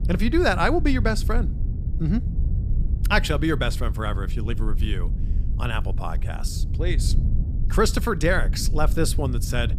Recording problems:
low rumble; noticeable; throughout; 15 dB below the speech

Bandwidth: 15 kHz